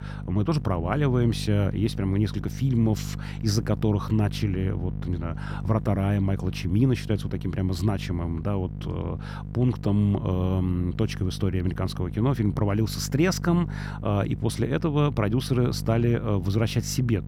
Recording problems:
electrical hum; noticeable; throughout; 50 Hz, 15 dB below the speech

